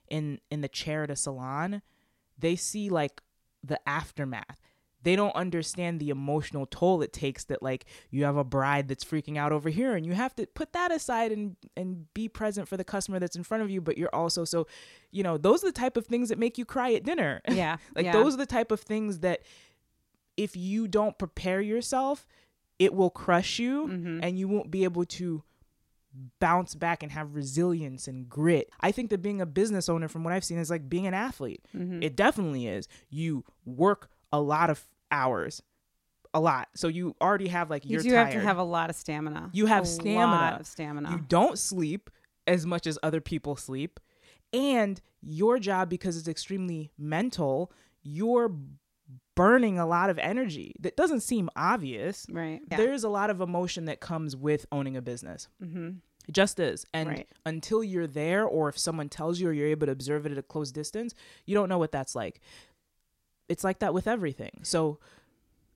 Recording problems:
none

